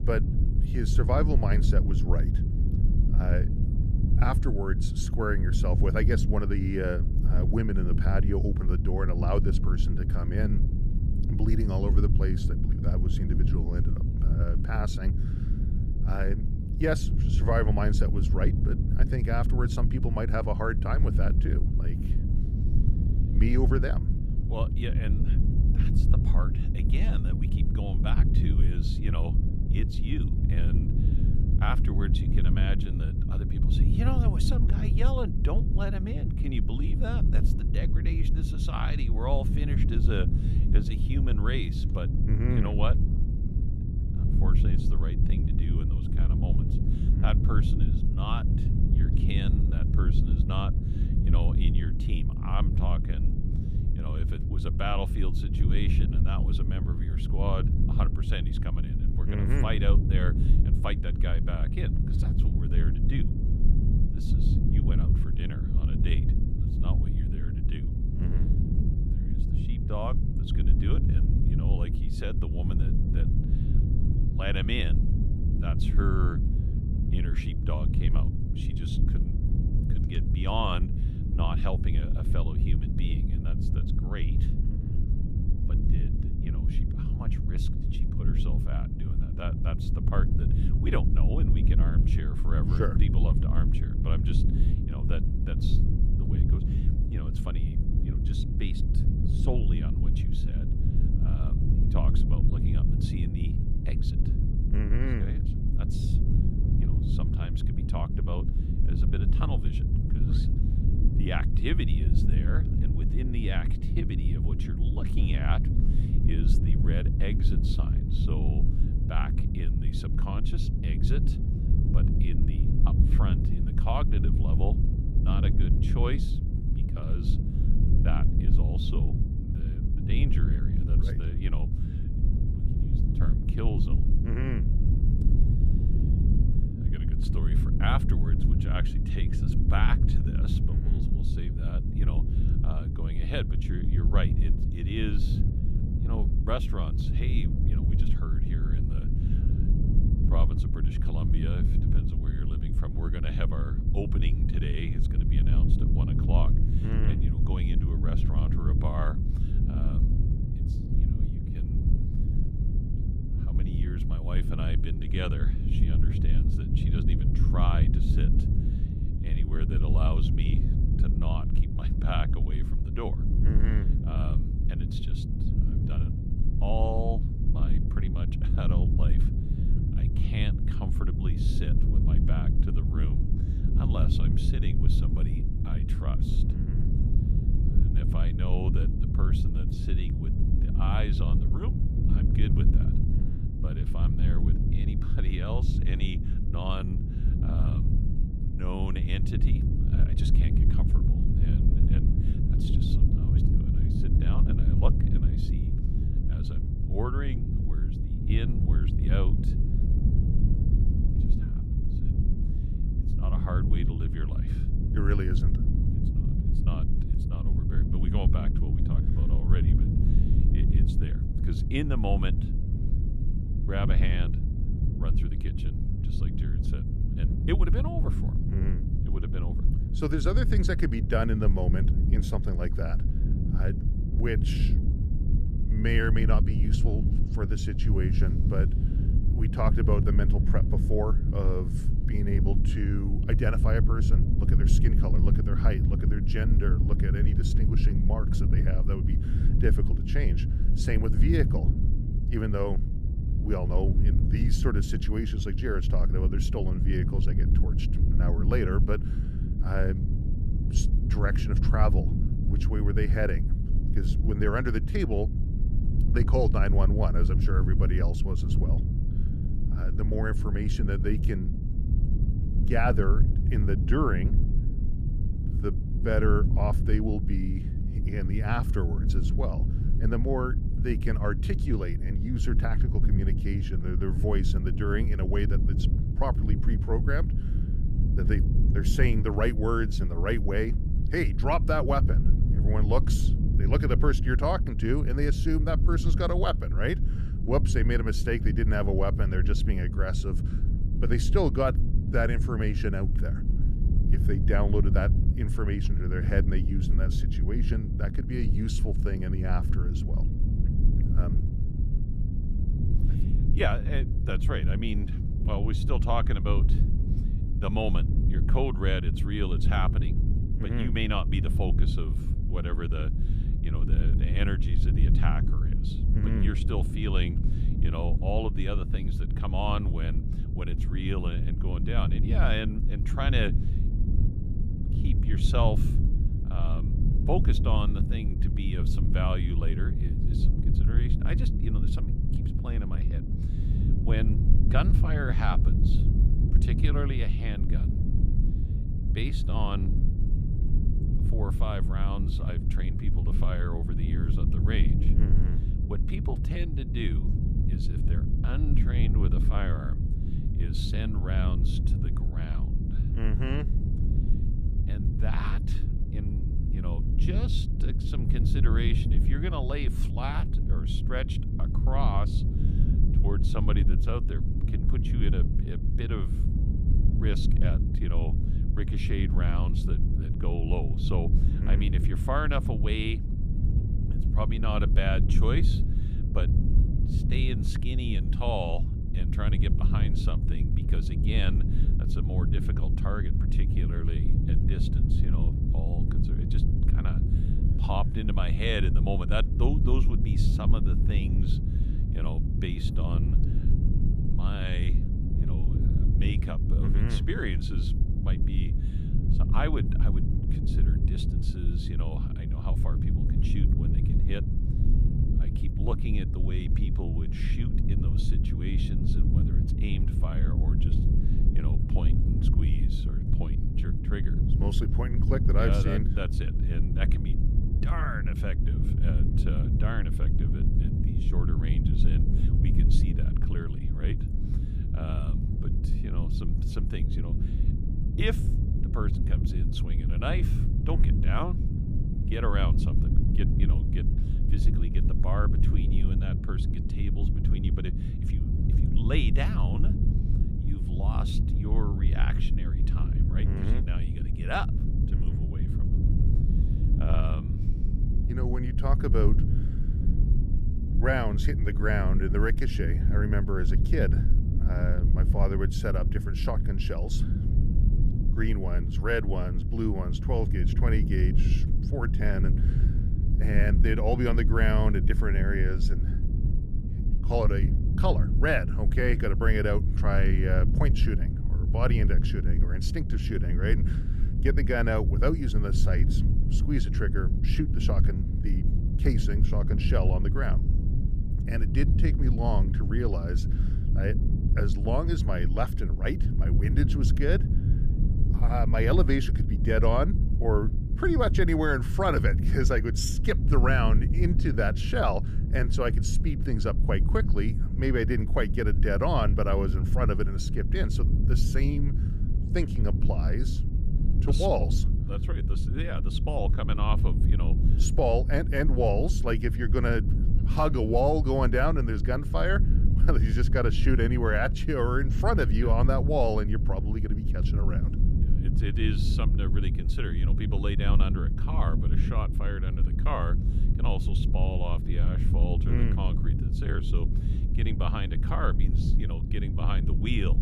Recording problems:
low rumble; loud; throughout; 6 dB below the speech

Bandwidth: 14.5 kHz